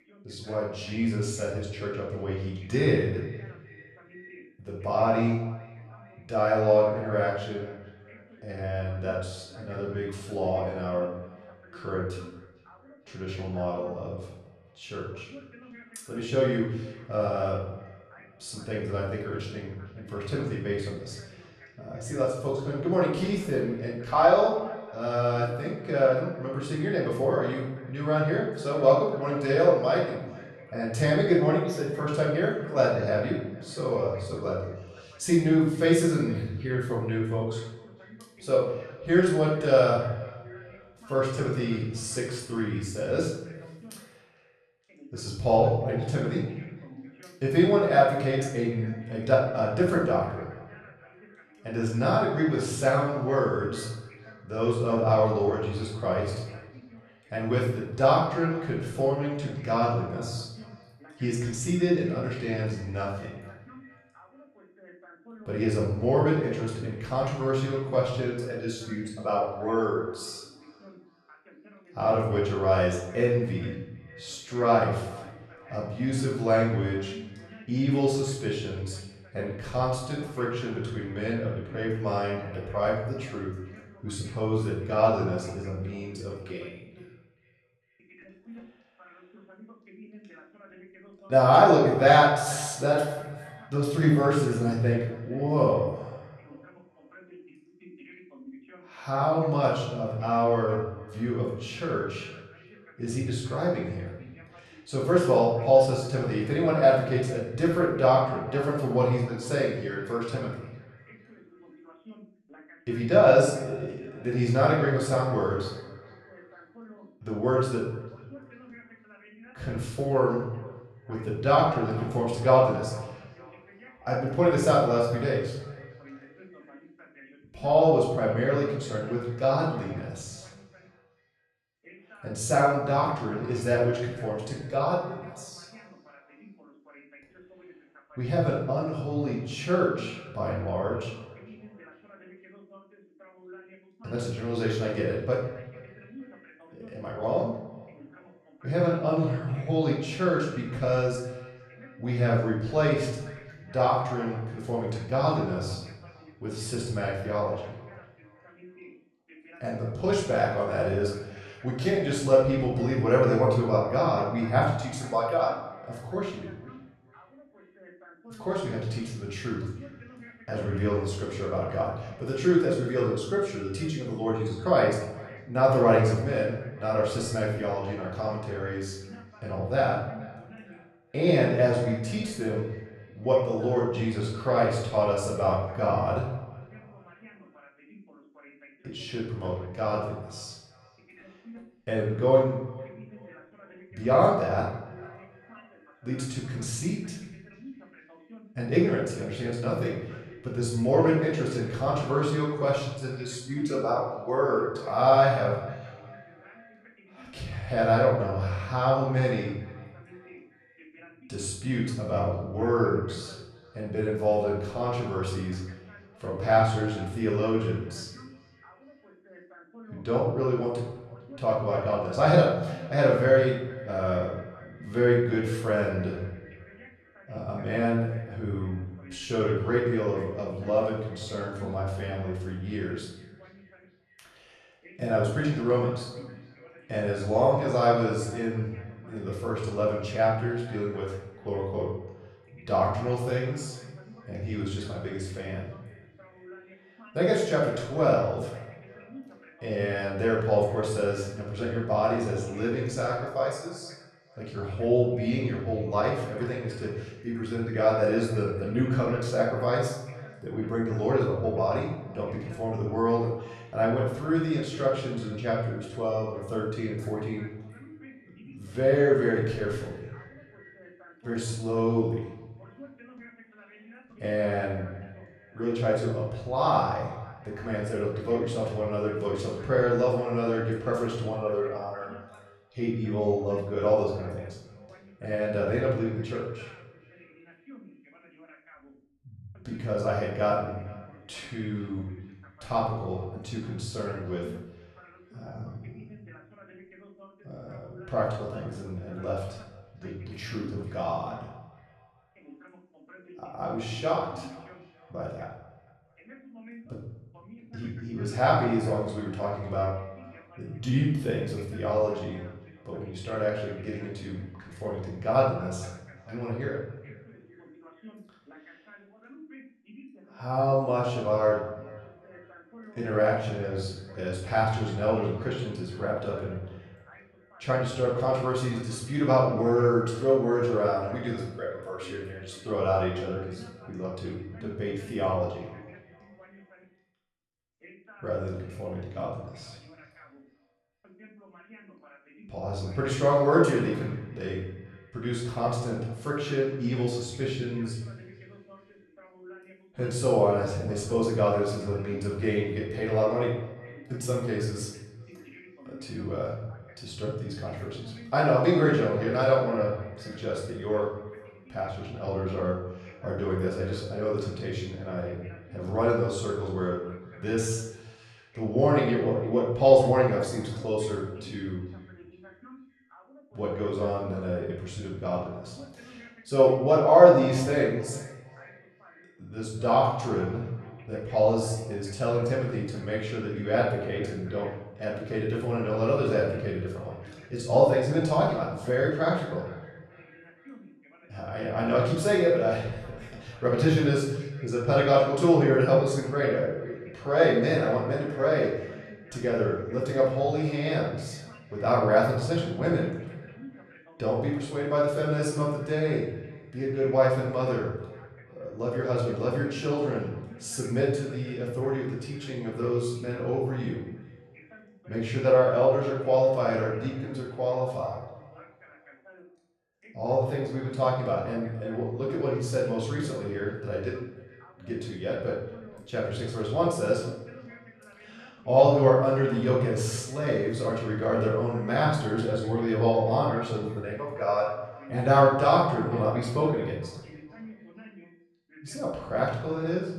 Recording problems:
off-mic speech; far
room echo; noticeable; dies away in 0.8 s
echo of what is said; faint; throughout; 450 ms later, 25 dB below the speech
voice in the background; faint; throughout; 25 dB below the speech

